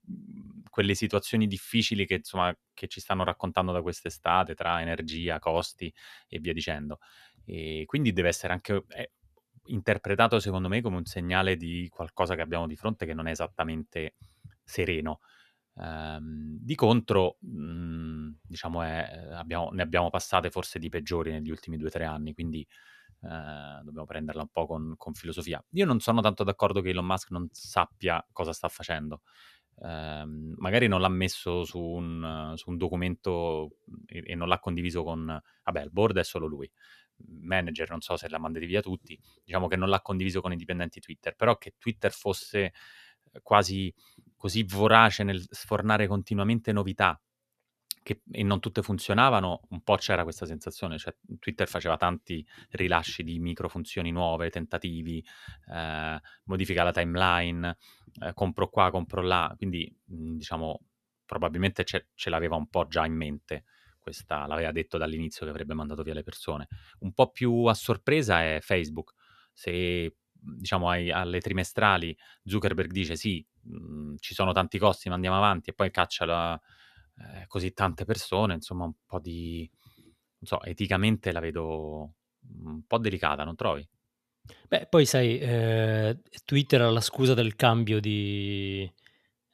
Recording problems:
none

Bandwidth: 14 kHz